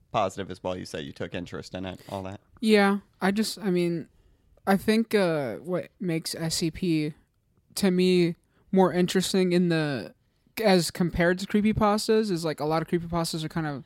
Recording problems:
none

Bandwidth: 16 kHz